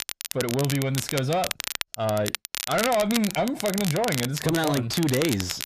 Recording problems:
distortion; slight; 10 dB below the speech
crackle, like an old record; loud; 5 dB below the speech

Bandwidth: 14.5 kHz